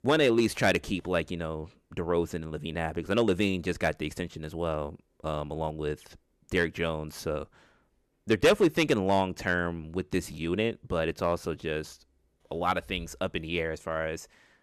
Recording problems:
distortion; slight; 1% of the sound clipped

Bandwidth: 13.5 kHz